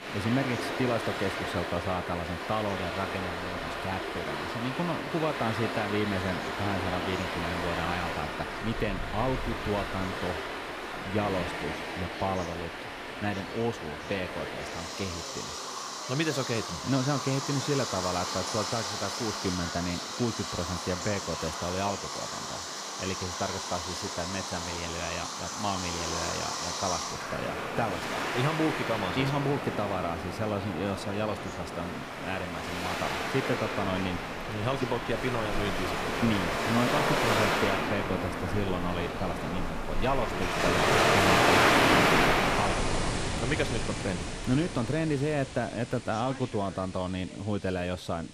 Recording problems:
rain or running water; very loud; throughout; 2 dB above the speech
background chatter; noticeable; throughout; 2 voices, 20 dB below the speech

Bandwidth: 15 kHz